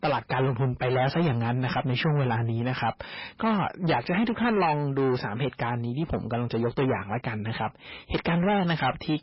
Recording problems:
distortion; heavy; 7 dB below the speech
garbled, watery; badly; nothing above 5.5 kHz

